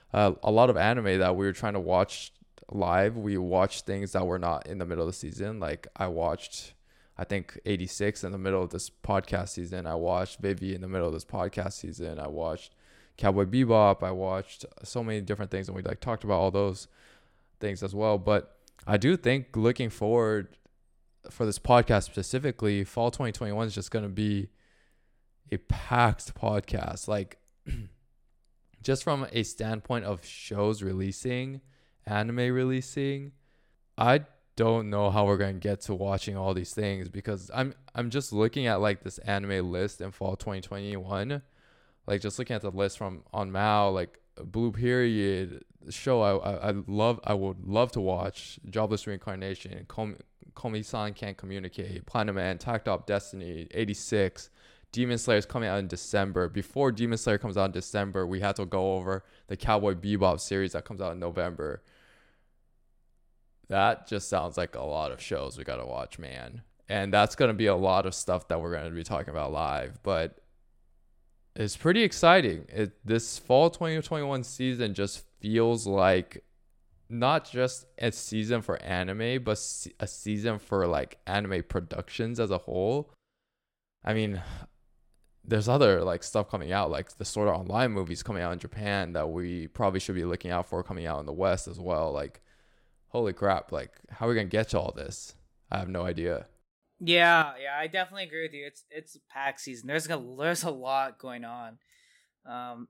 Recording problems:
none

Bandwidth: 16 kHz